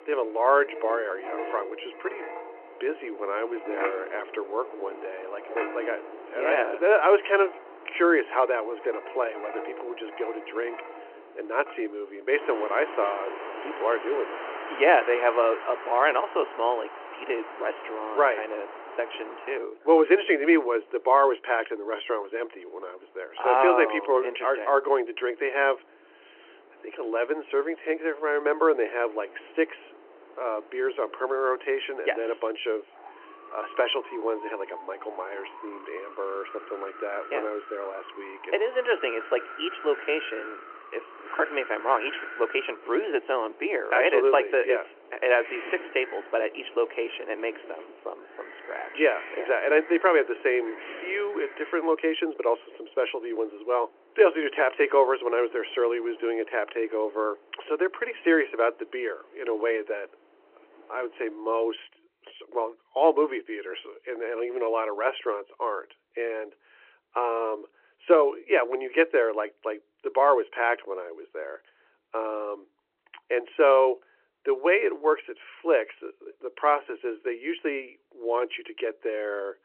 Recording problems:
phone-call audio
wind in the background; noticeable; until 1:02; 15 dB below the speech

